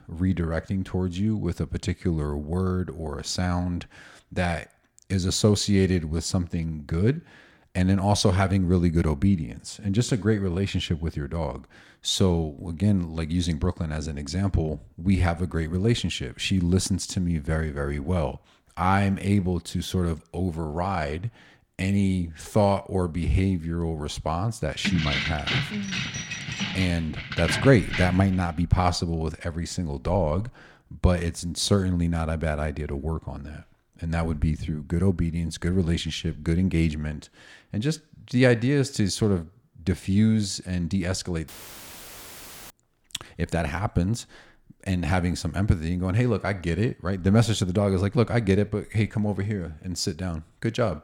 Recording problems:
jangling keys; noticeable; from 25 to 28 s; peak level with the speech
audio cutting out; filled with static; at 41 s for 1 s

